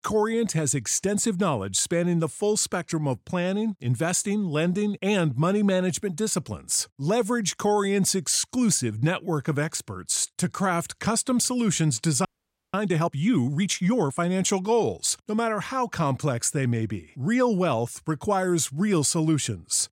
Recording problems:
audio freezing; at 12 s

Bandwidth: 16 kHz